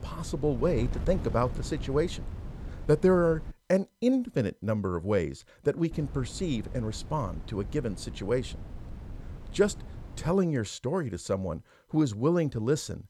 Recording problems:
wind noise on the microphone; occasional gusts; until 3.5 s and from 6 to 10 s; 20 dB below the speech

